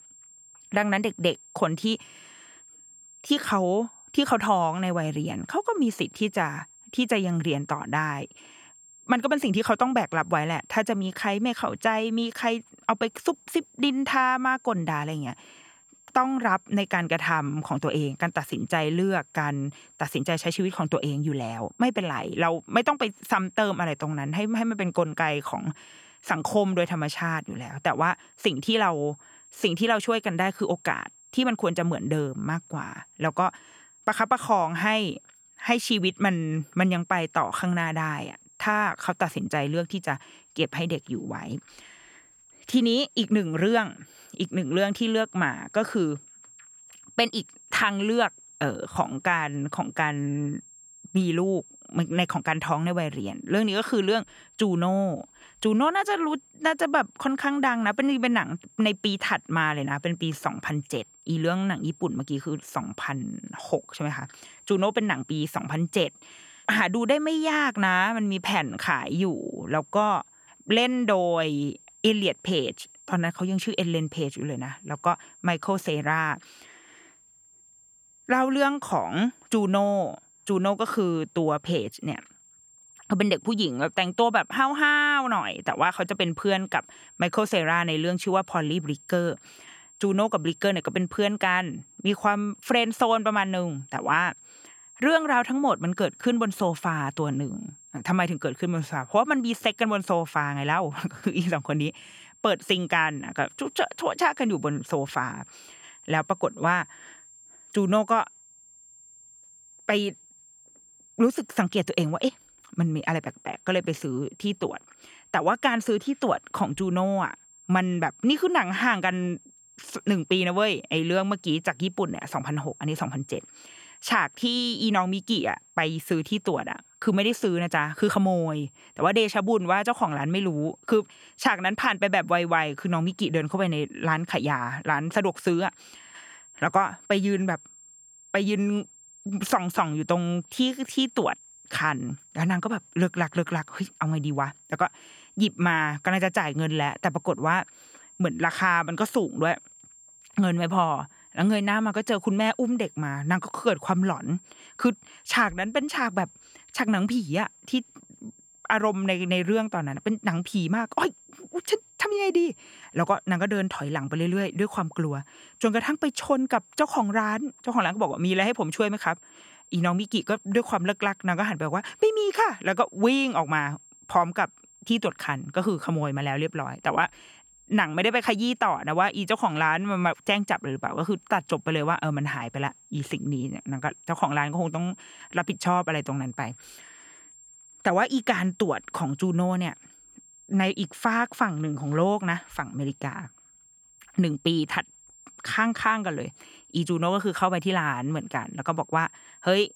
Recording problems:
high-pitched whine; faint; throughout; 7.5 kHz, 25 dB below the speech

